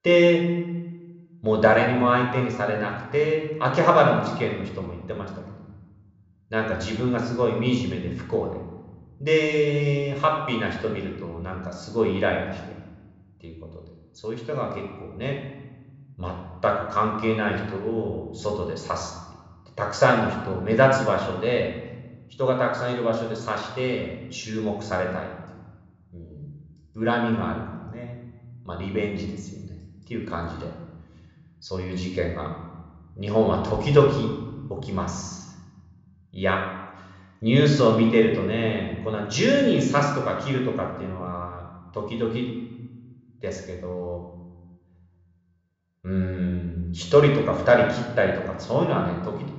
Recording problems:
room echo; noticeable; dies away in 1.2 s
high frequencies cut off; noticeable; nothing above 8 kHz
off-mic speech; somewhat distant

